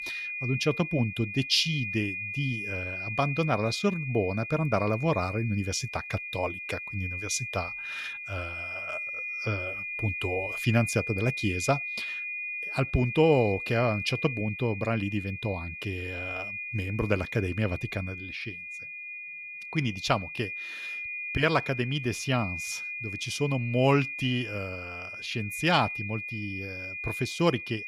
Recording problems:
high-pitched whine; loud; throughout; 2.5 kHz, 5 dB below the speech

